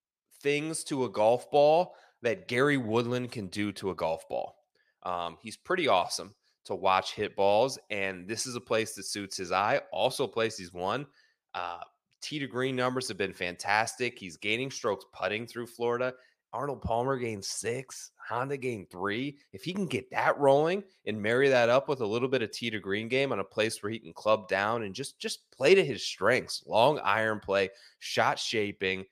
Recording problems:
none

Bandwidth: 15 kHz